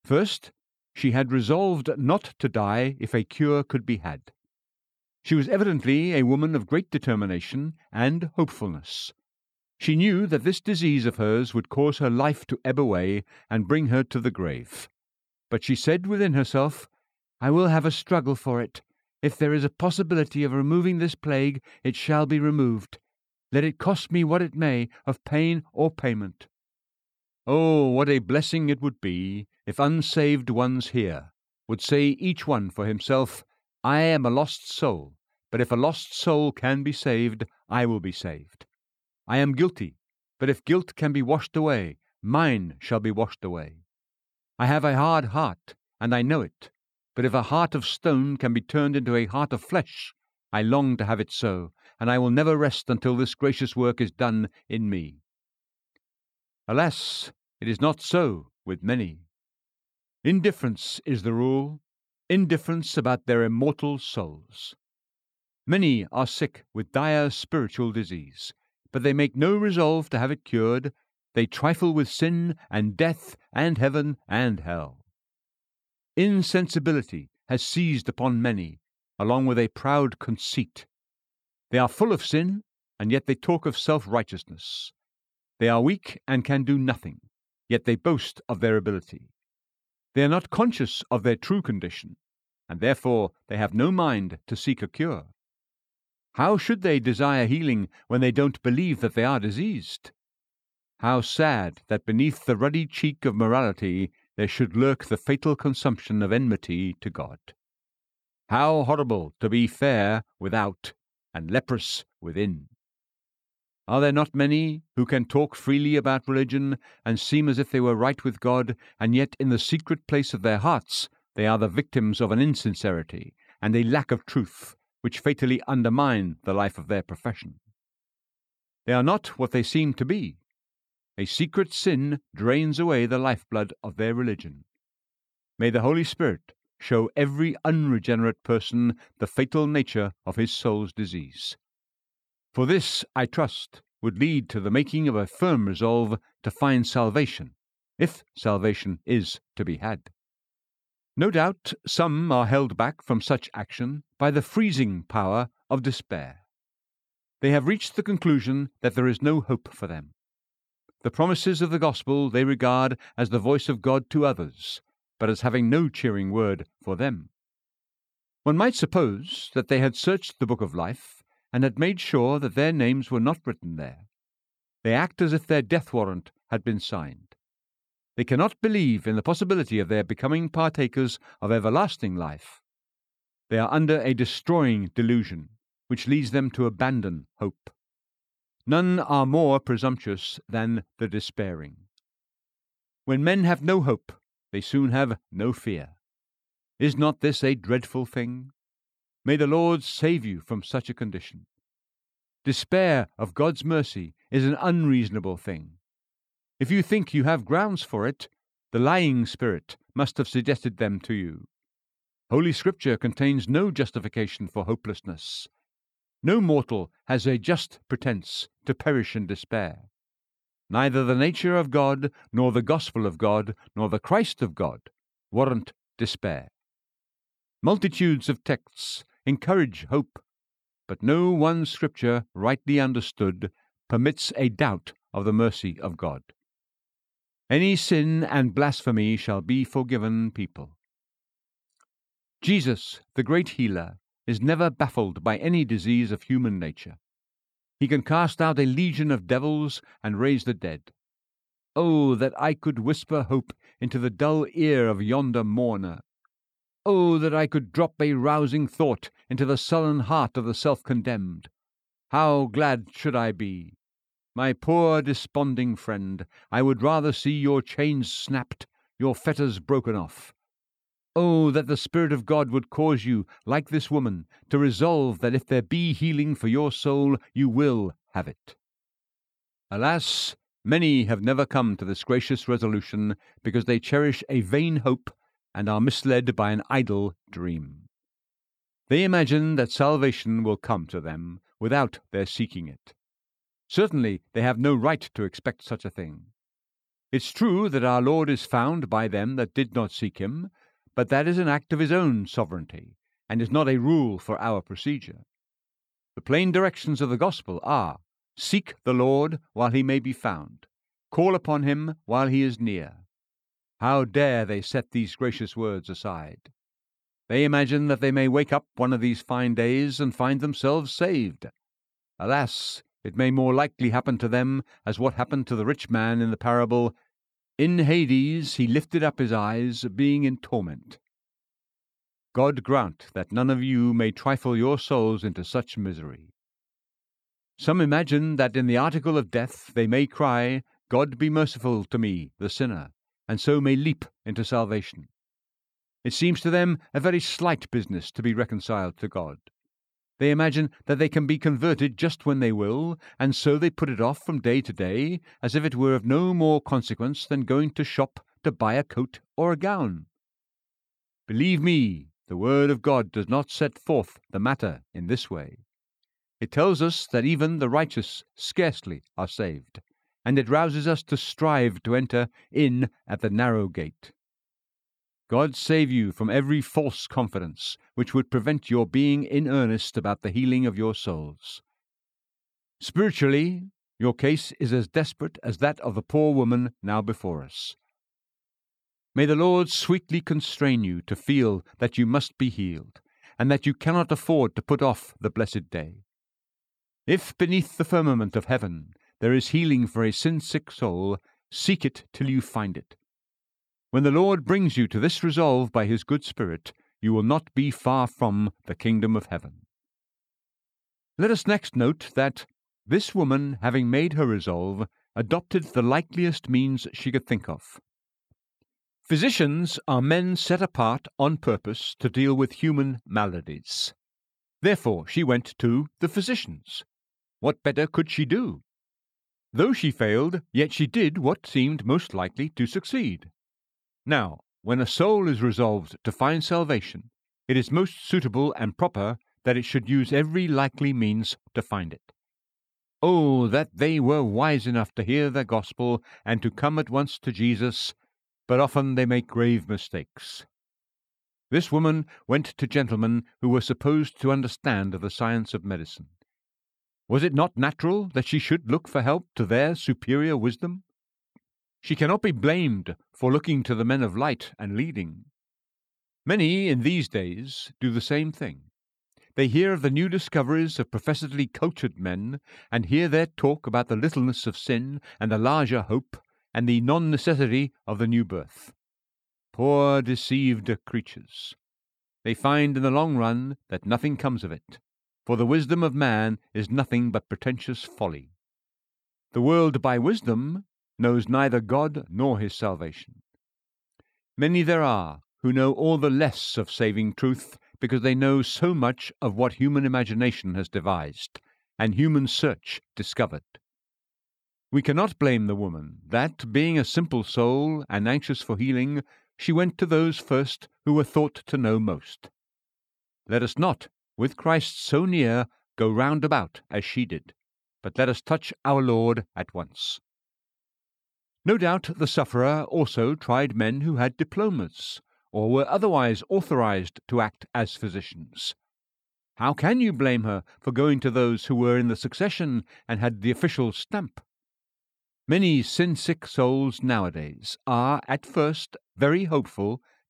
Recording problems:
none

